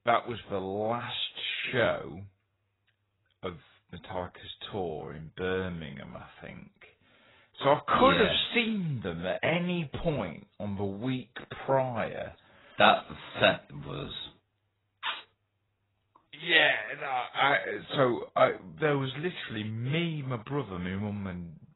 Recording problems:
garbled, watery; badly; nothing above 4 kHz
wrong speed, natural pitch; too slow; 0.6 times normal speed

